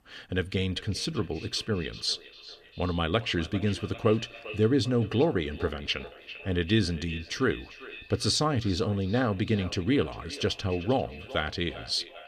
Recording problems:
echo of what is said; noticeable; throughout; 400 ms later, 15 dB below the speech

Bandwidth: 14.5 kHz